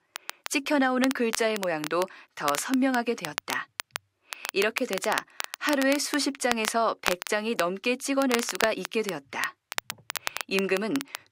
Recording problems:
crackle, like an old record; loud; 7 dB below the speech

